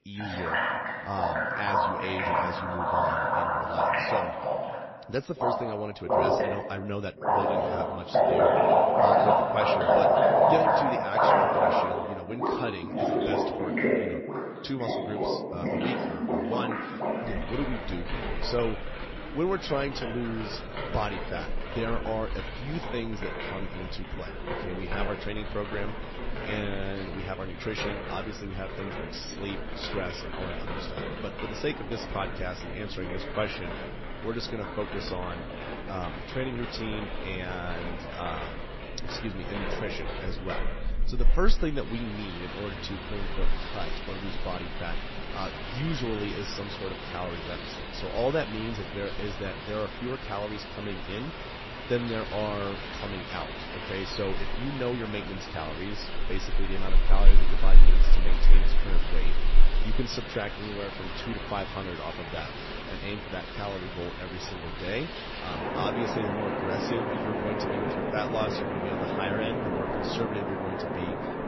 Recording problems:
garbled, watery; slightly; nothing above 5.5 kHz
rain or running water; very loud; throughout; 5 dB above the speech

